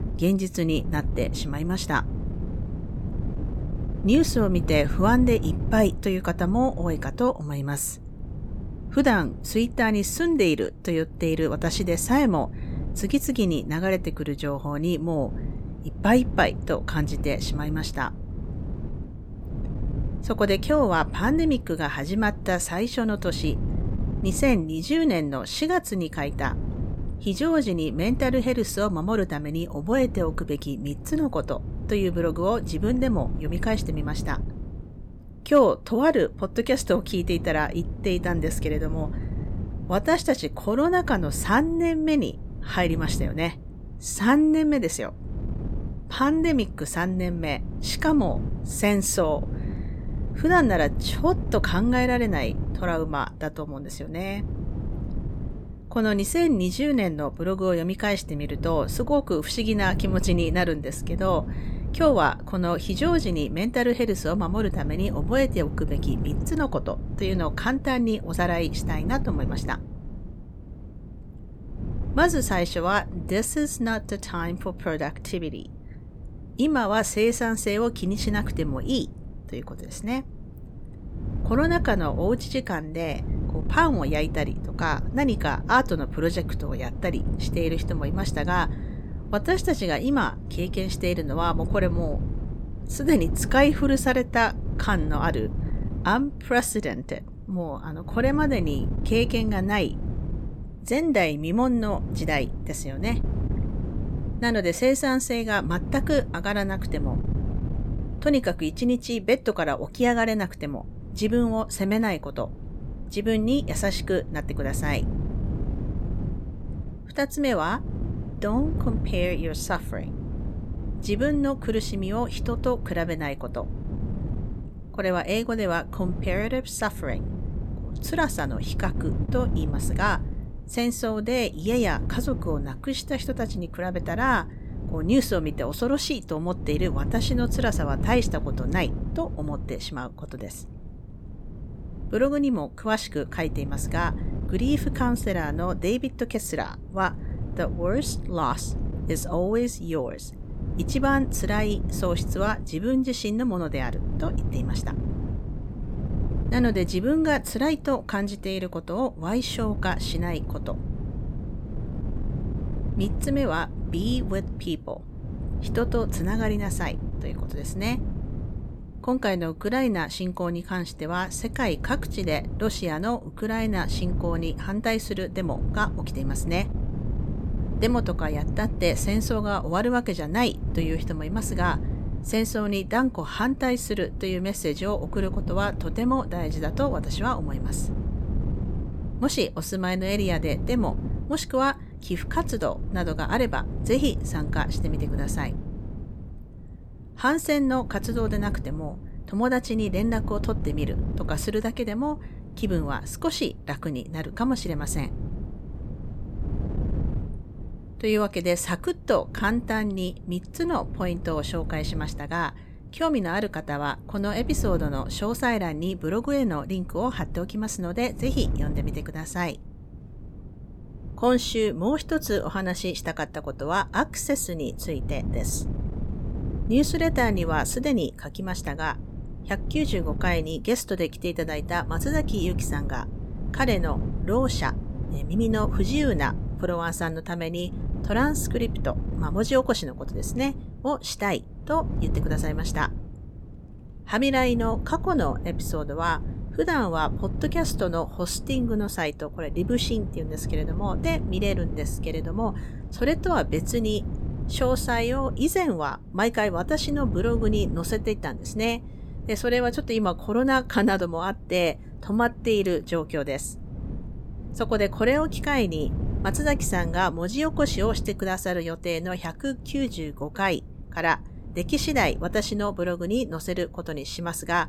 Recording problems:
wind noise on the microphone; occasional gusts; 15 dB below the speech

